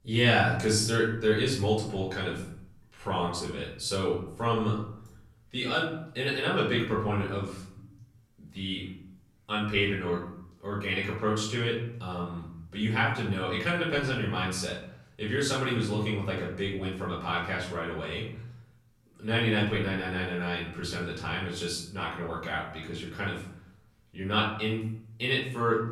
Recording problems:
off-mic speech; far
room echo; noticeable; dies away in 0.6 s

